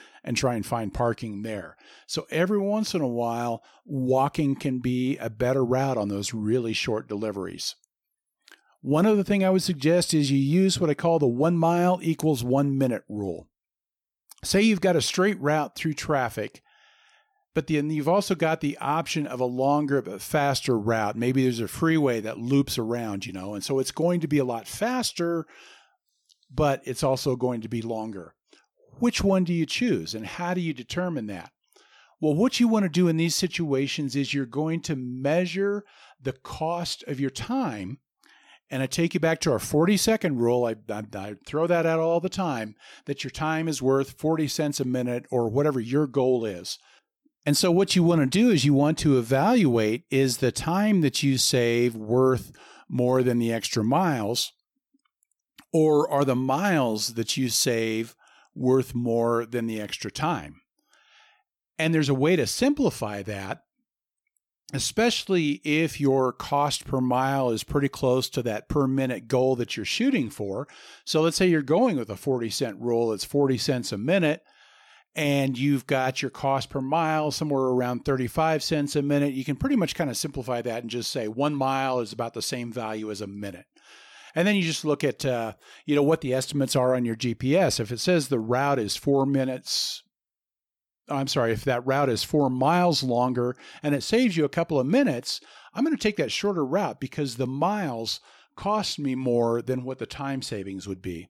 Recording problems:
none

